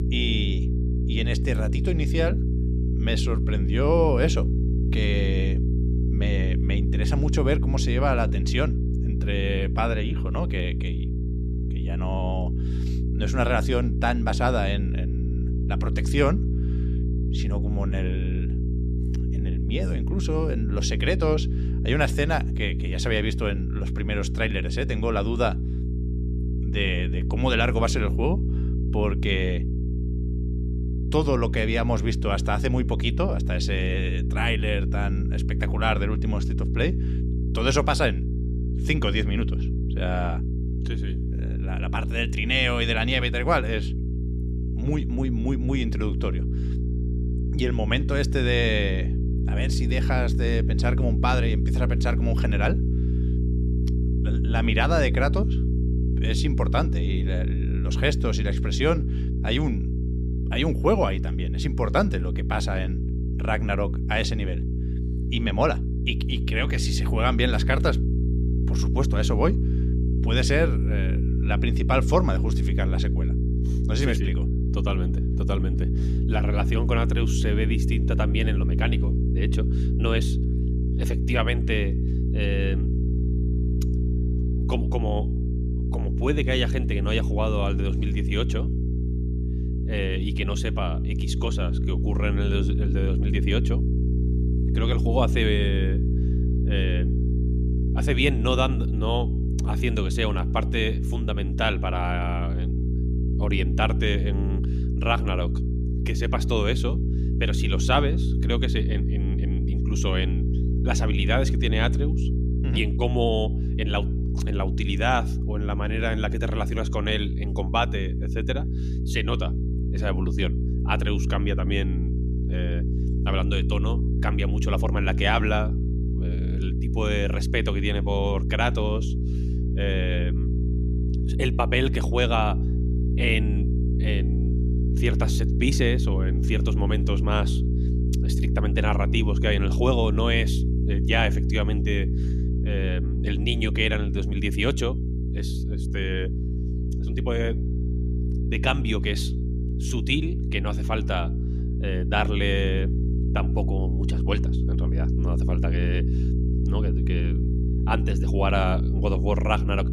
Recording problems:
electrical hum; loud; throughout; 60 Hz, 9 dB below the speech

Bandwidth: 14.5 kHz